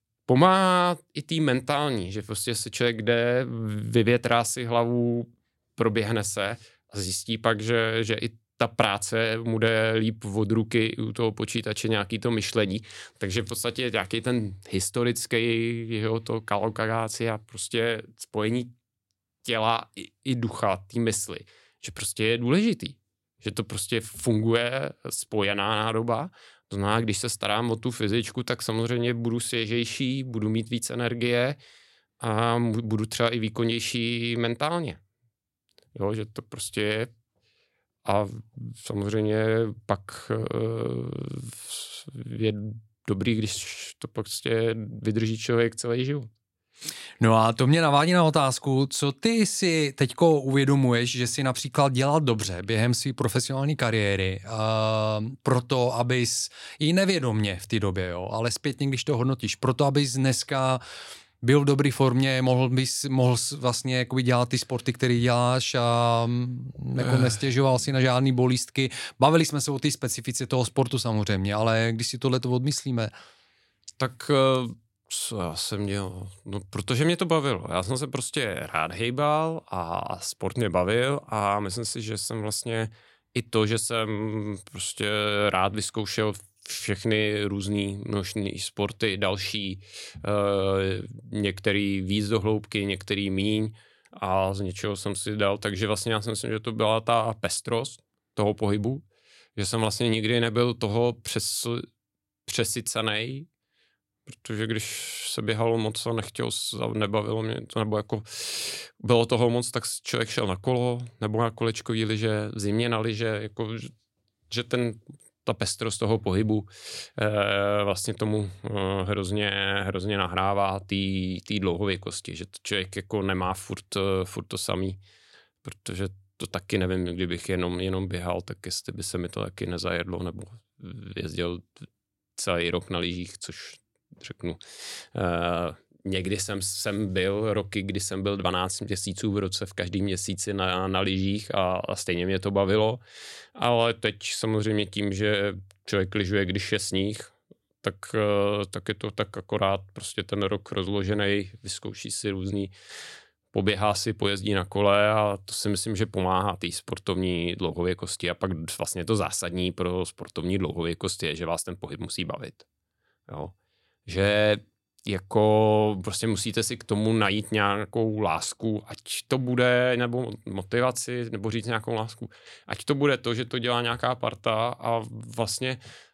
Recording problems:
none

